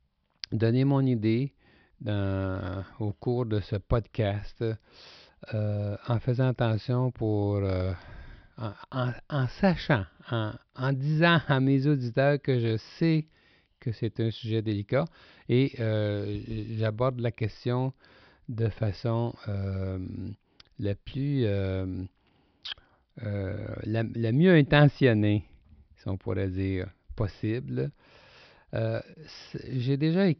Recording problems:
high frequencies cut off; noticeable; nothing above 5.5 kHz

